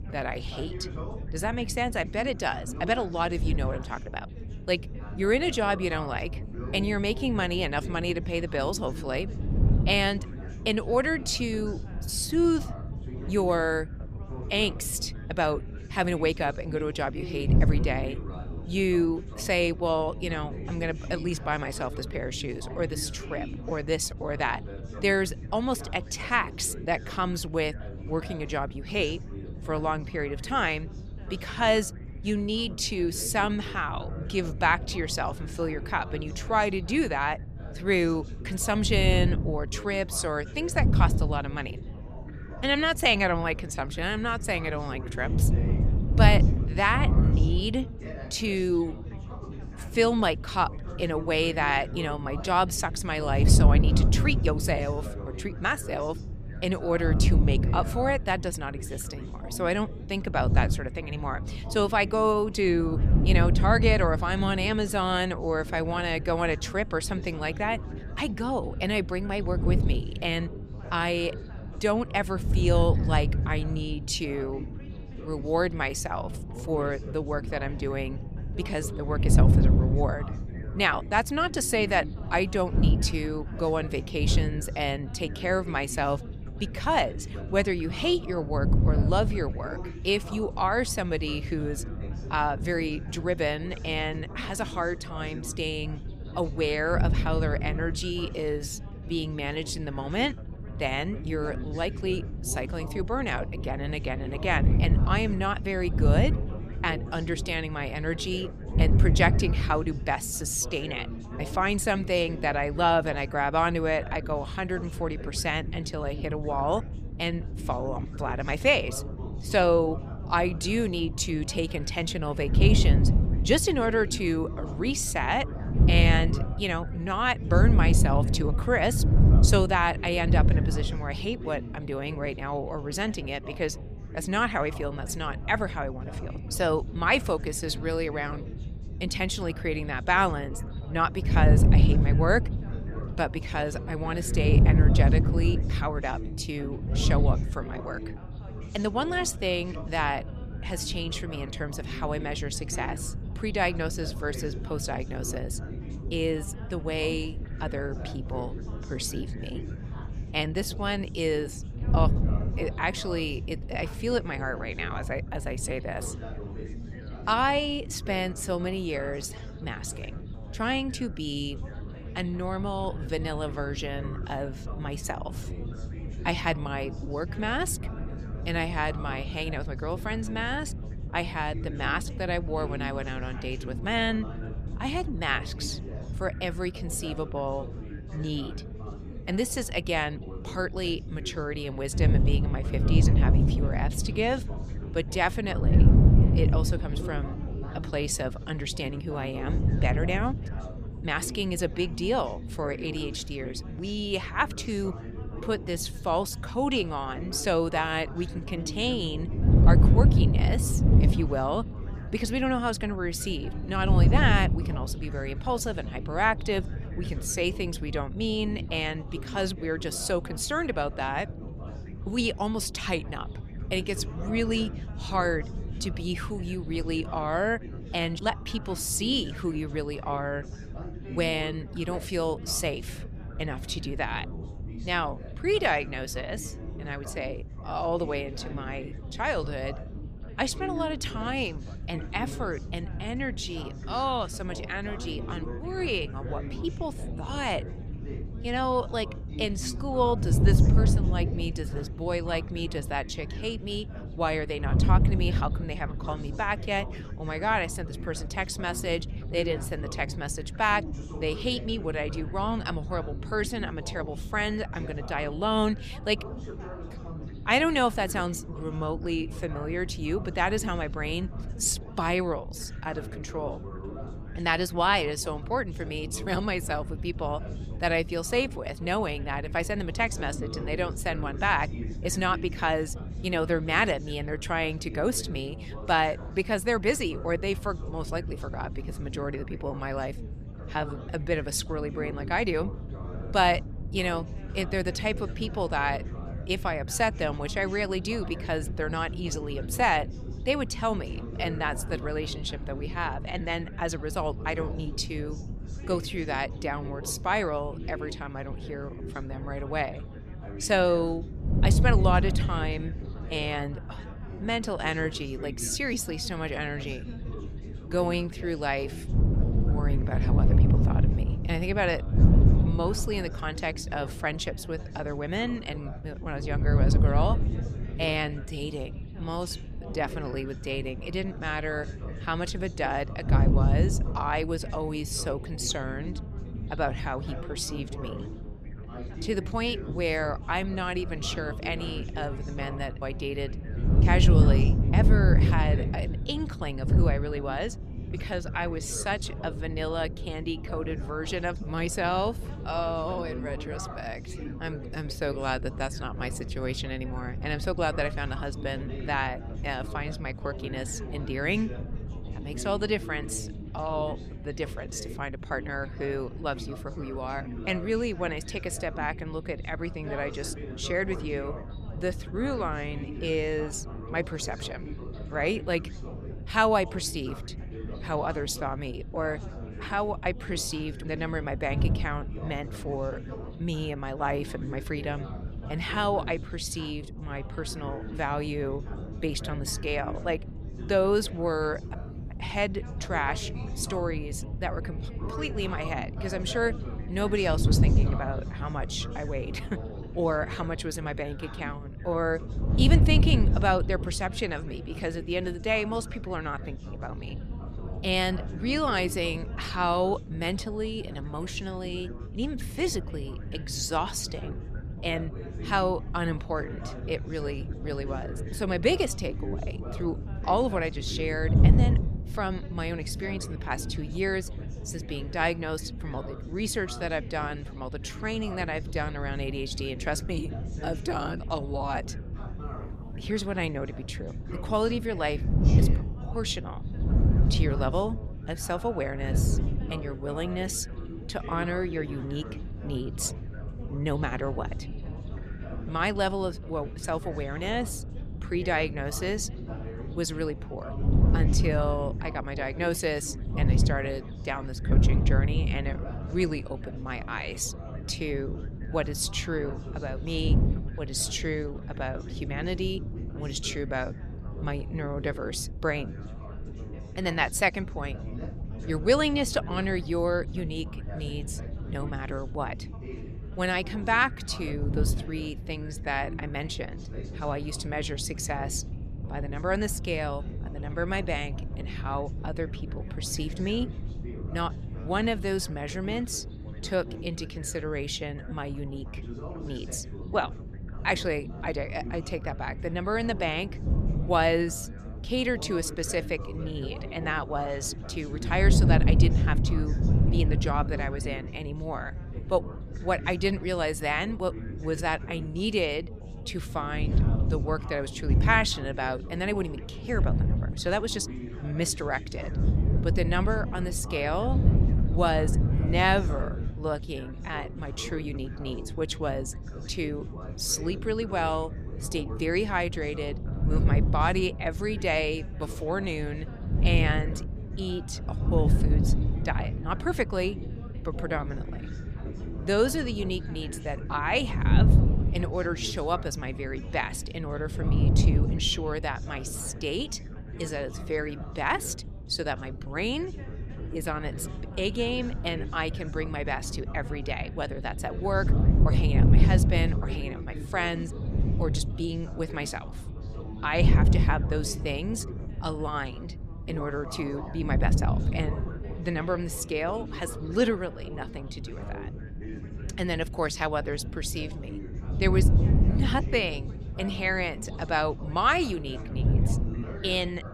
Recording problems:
background chatter; noticeable; throughout; 4 voices, 15 dB below the speech
wind noise on the microphone; occasional gusts; 15 dB below the speech

